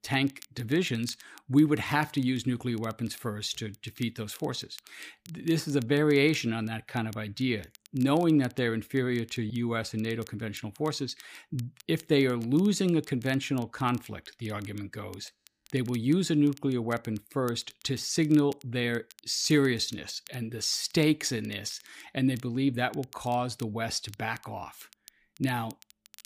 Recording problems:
crackle, like an old record; faint; 25 dB below the speech

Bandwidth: 15 kHz